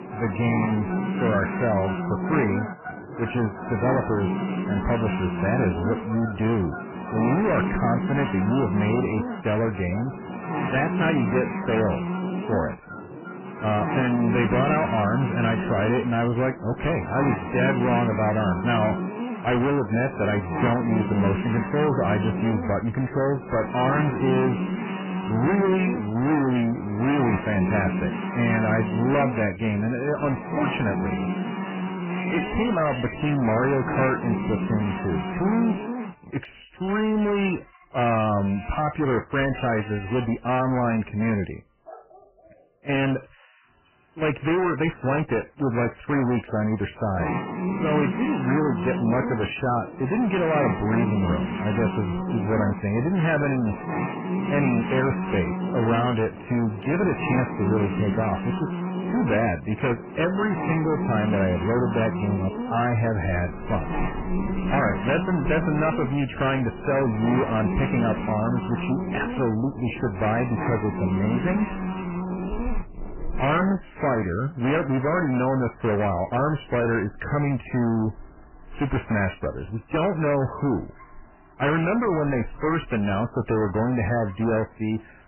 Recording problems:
distortion; heavy; 21% of the sound clipped
garbled, watery; badly; nothing above 3 kHz
electrical hum; loud; until 36 s and from 47 s to 1:14; 60 Hz, 7 dB below the speech
animal sounds; noticeable; throughout; 20 dB below the speech

